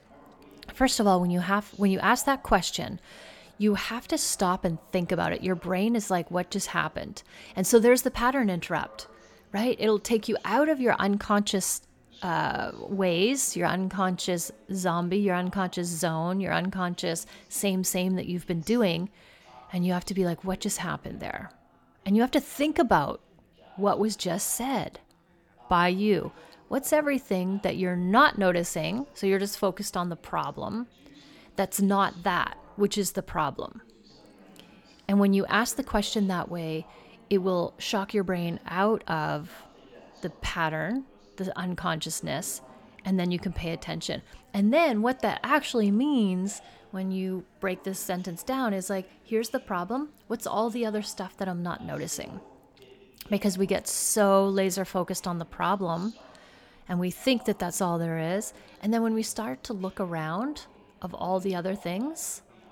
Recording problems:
background chatter; faint; throughout; 3 voices, 25 dB below the speech

